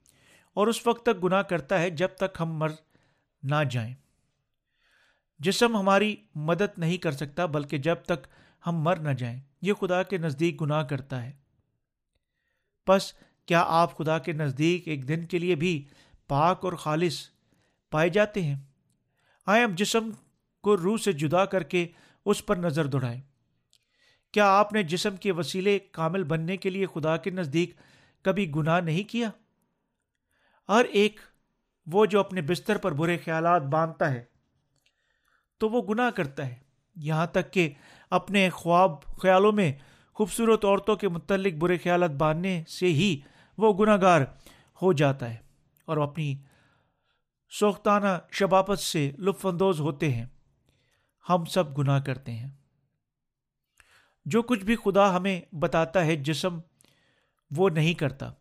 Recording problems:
none

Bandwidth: 15 kHz